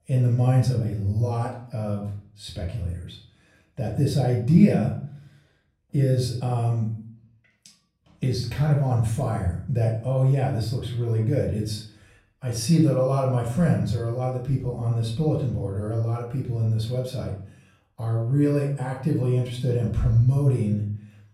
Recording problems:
off-mic speech; far
room echo; slight; dies away in 0.5 s

